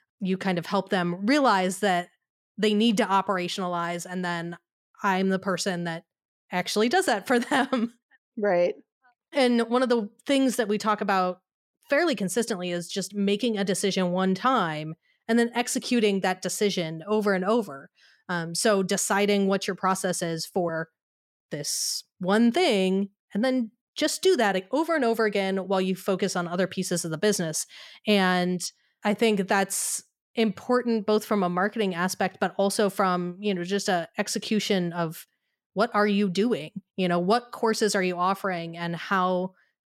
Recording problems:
none

